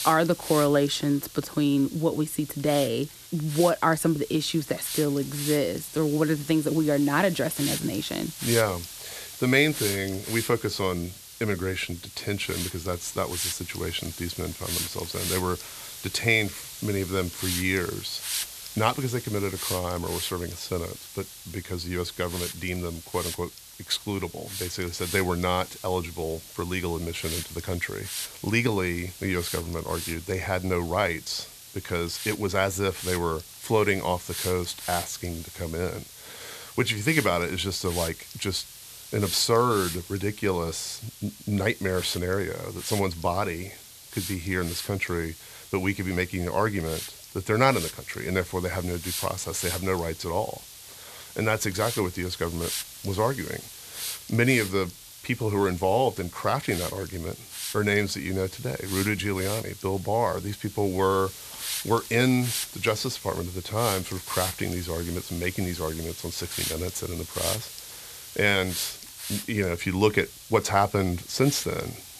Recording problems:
hiss; loud; throughout; 8 dB below the speech

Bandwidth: 14 kHz